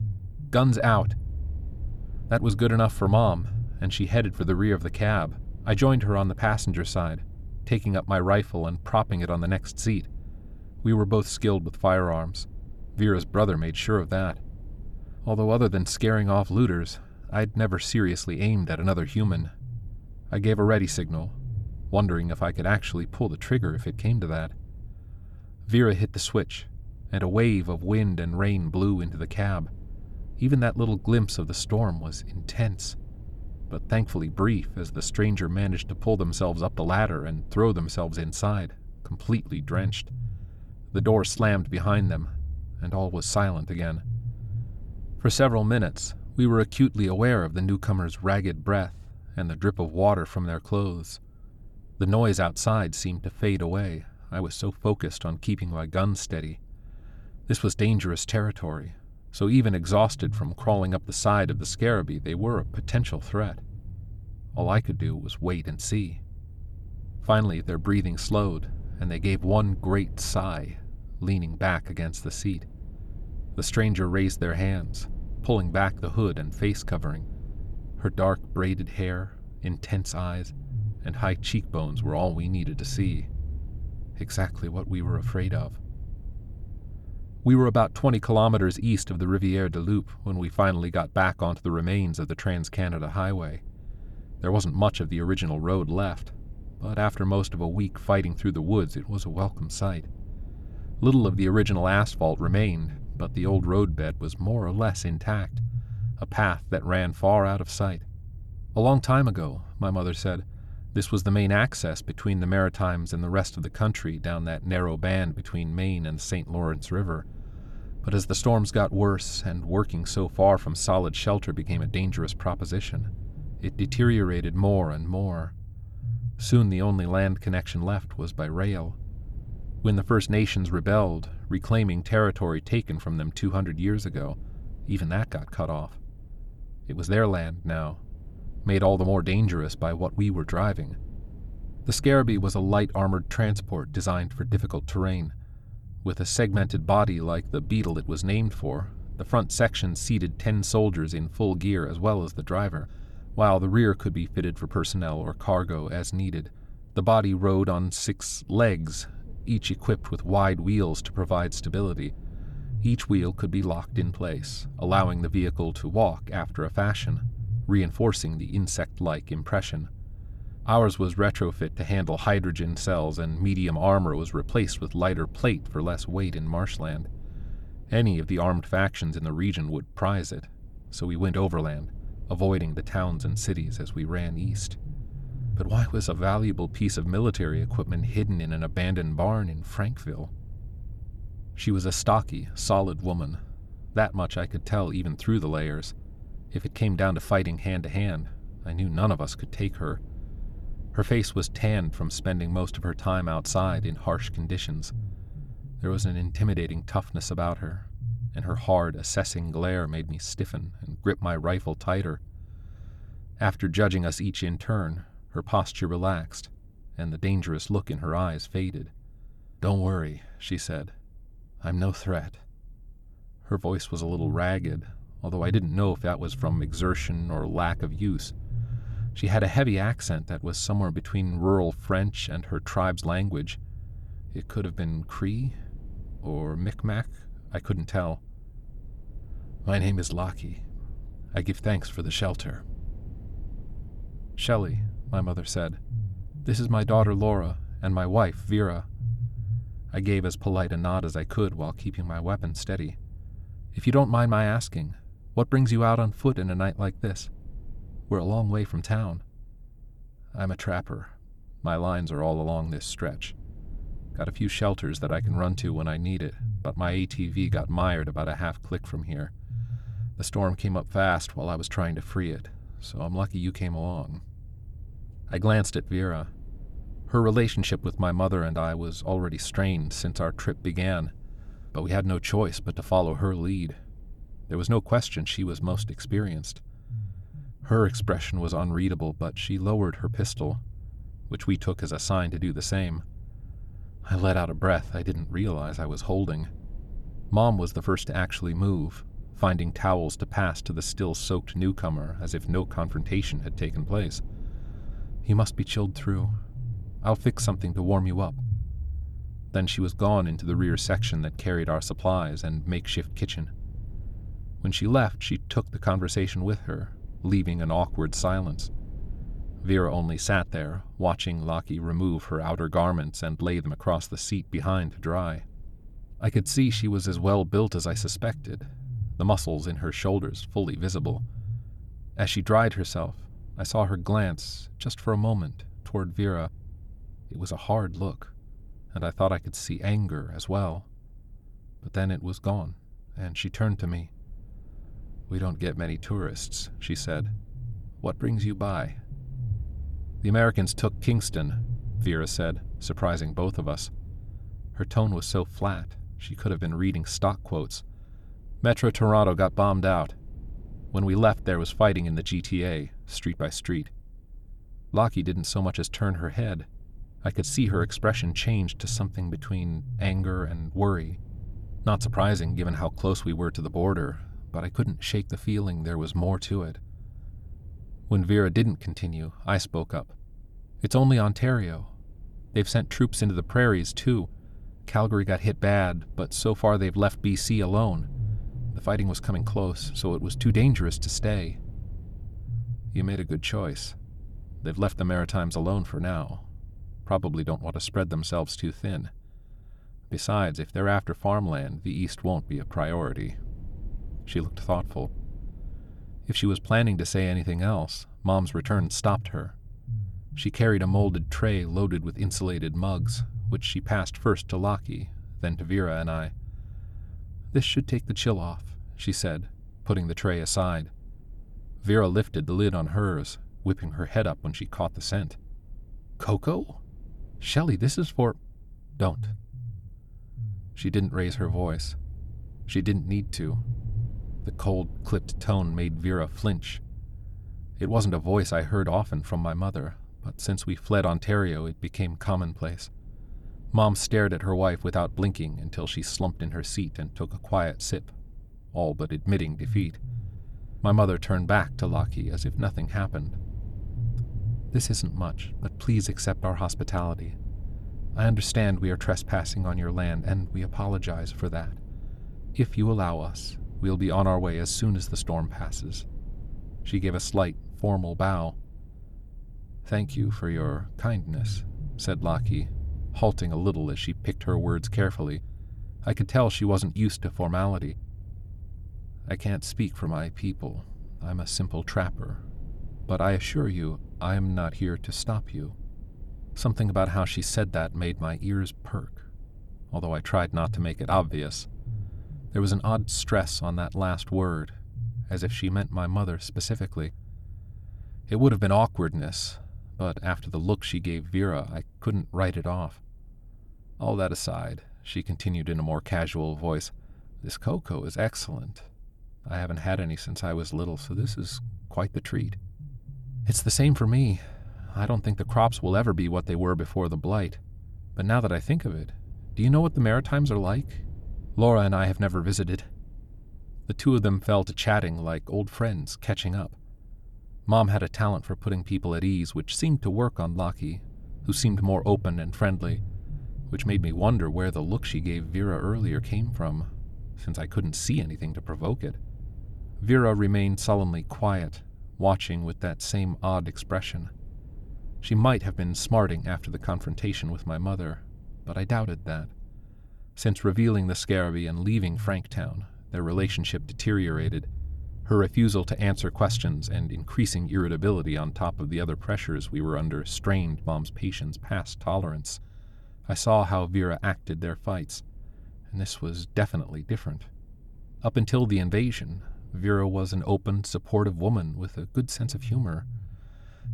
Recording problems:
low rumble; faint; throughout; 25 dB below the speech

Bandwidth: 18.5 kHz